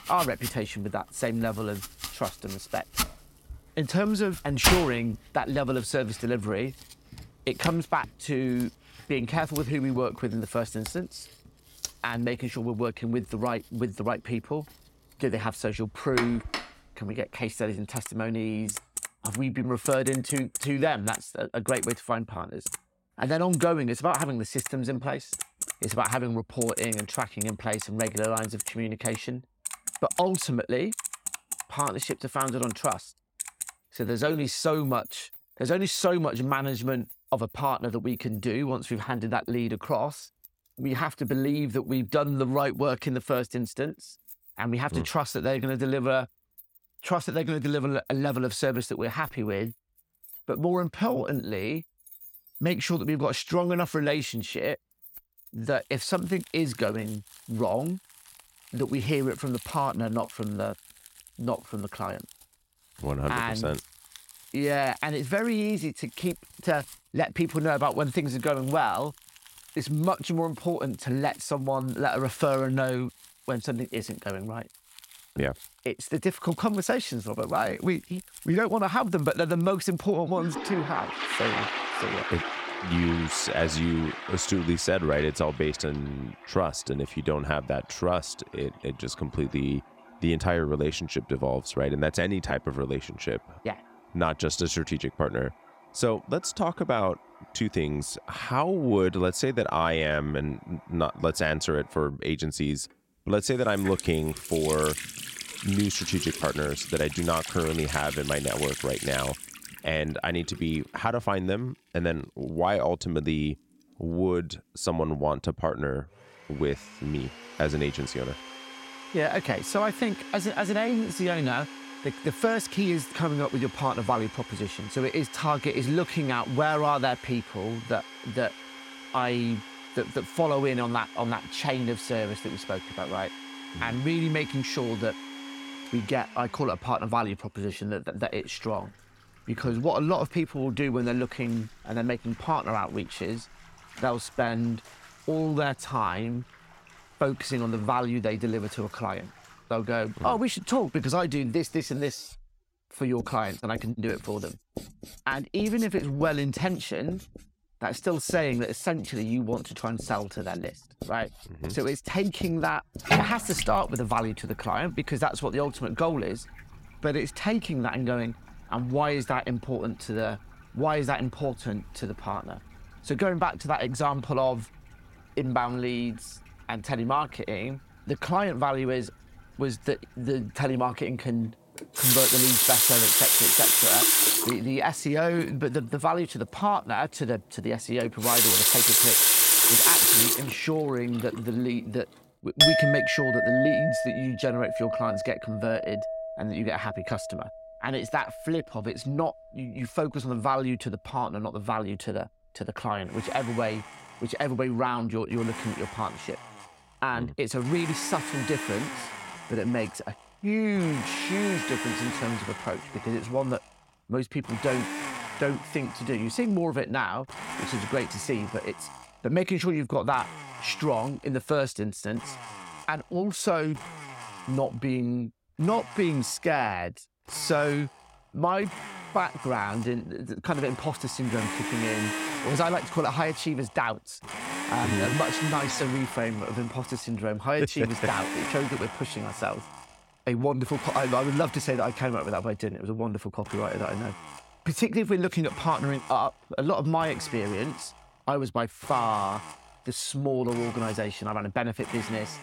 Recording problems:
household noises; very loud; throughout; 1 dB above the speech

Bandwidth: 16.5 kHz